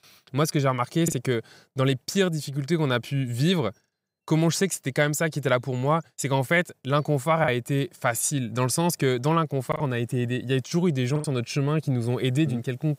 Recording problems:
choppy; occasionally; 2% of the speech affected

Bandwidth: 15.5 kHz